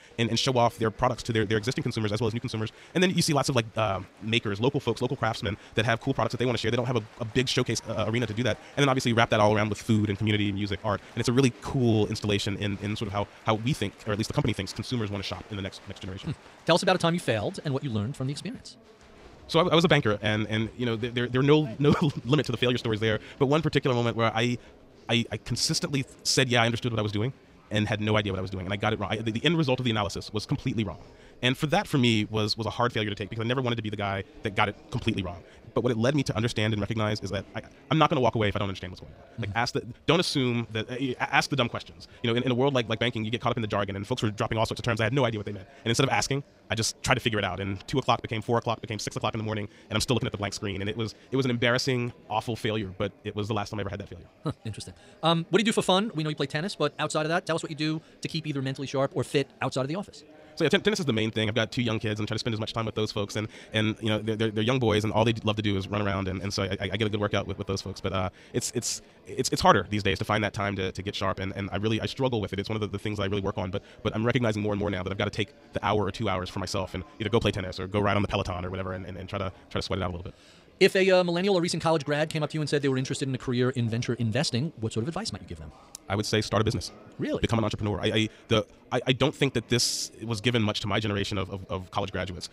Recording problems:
wrong speed, natural pitch; too fast; 1.7 times normal speed
chatter from many people; faint; throughout; 25 dB below the speech

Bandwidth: 15.5 kHz